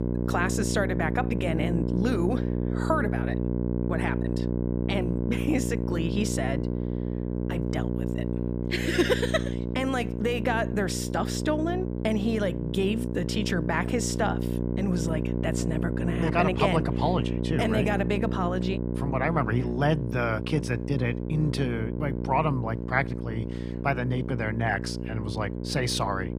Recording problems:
electrical hum; loud; throughout; 60 Hz, 6 dB below the speech

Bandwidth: 15 kHz